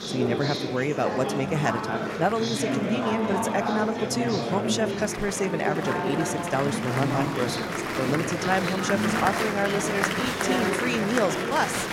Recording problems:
murmuring crowd; very loud; throughout; as loud as the speech

